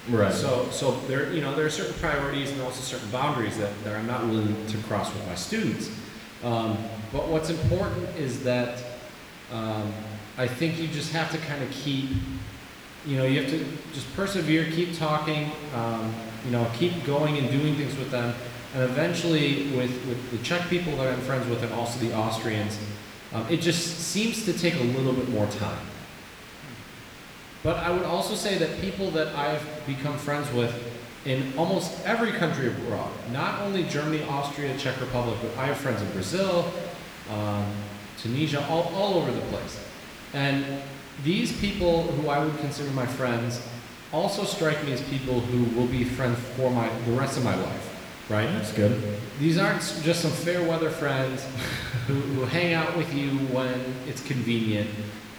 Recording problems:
room echo; noticeable; dies away in 1.2 s
off-mic speech; somewhat distant
hiss; noticeable; throughout; 15 dB below the speech

